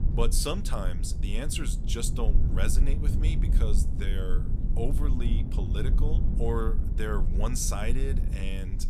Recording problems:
low rumble; loud; throughout; 8 dB below the speech

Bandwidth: 14.5 kHz